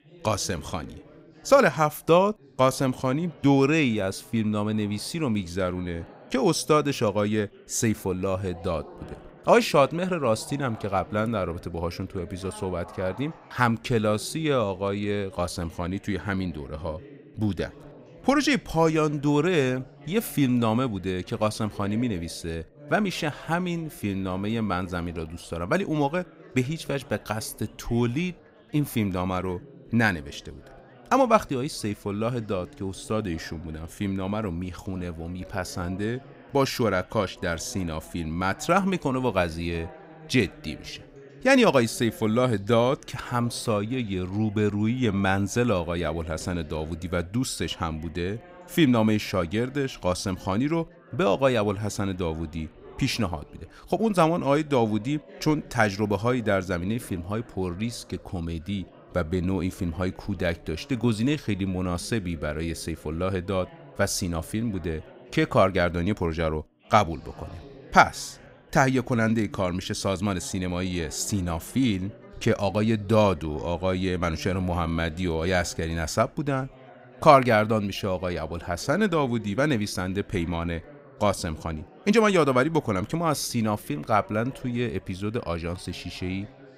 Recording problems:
background chatter; faint; throughout; 4 voices, 20 dB below the speech

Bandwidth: 15.5 kHz